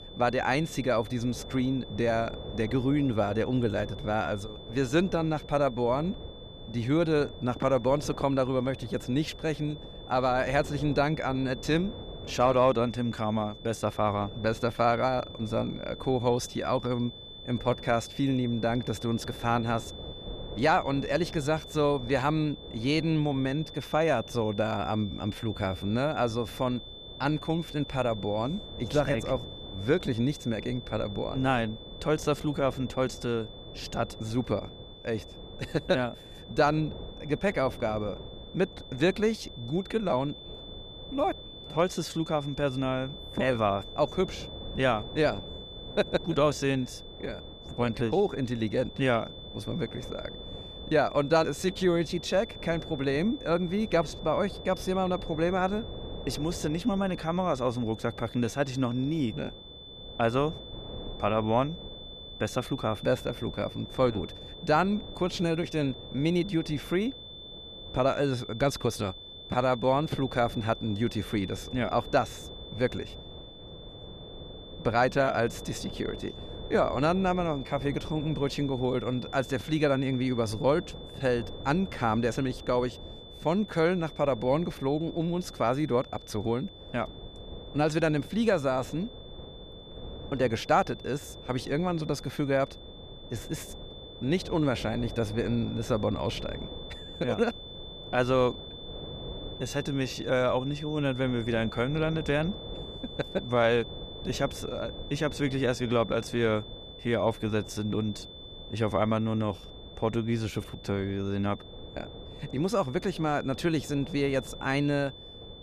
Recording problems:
high-pitched whine; noticeable; throughout; 3.5 kHz, 15 dB below the speech
wind noise on the microphone; occasional gusts; 20 dB below the speech

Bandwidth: 14.5 kHz